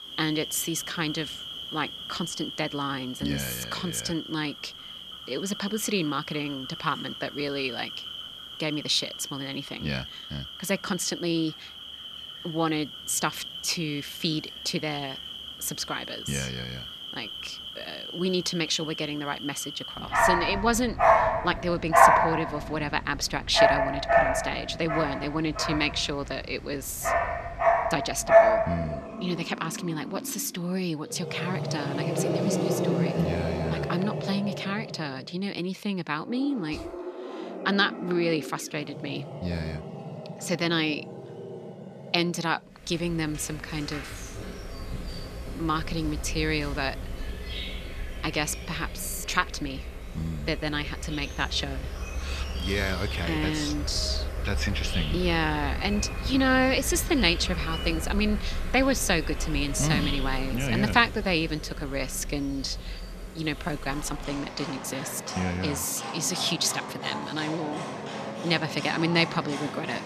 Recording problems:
animal sounds; loud; throughout; 2 dB below the speech

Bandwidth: 14 kHz